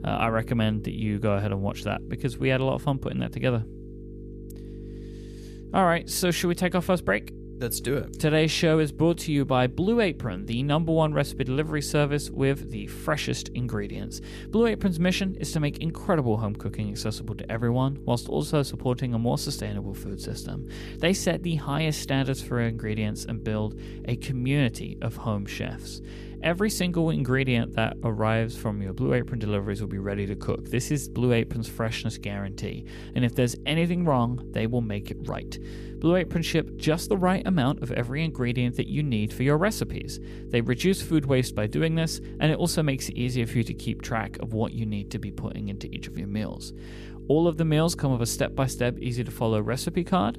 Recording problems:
electrical hum; noticeable; throughout; 50 Hz, 15 dB below the speech

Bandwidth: 14.5 kHz